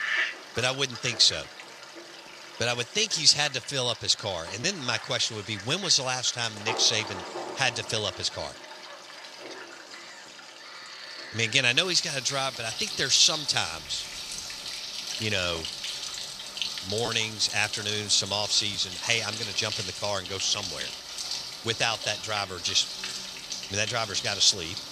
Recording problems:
thin; somewhat; fading below 1 kHz
animal sounds; loud; throughout; 10 dB below the speech

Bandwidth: 14.5 kHz